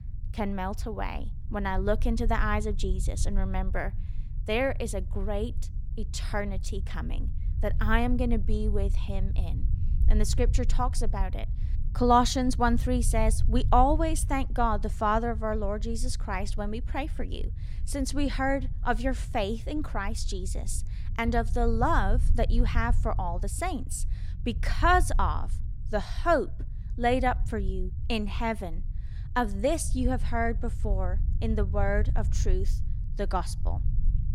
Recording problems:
low rumble; faint; throughout; 20 dB below the speech

